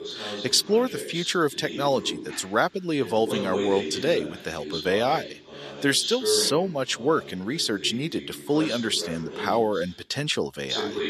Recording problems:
thin; very slightly; fading below 1 kHz
voice in the background; loud; throughout; 8 dB below the speech

